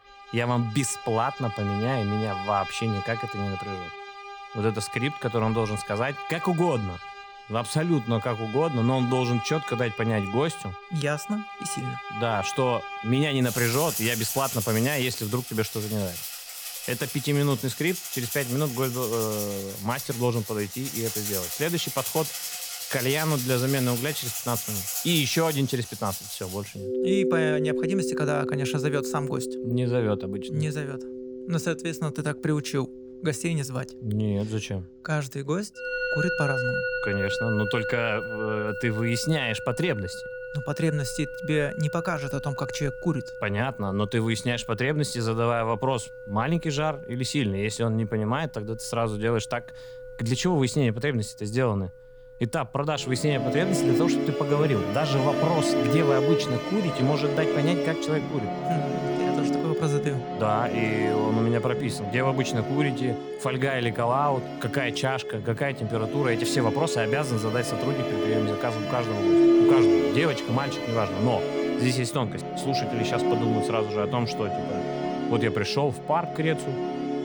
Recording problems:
background music; loud; throughout; 2 dB below the speech

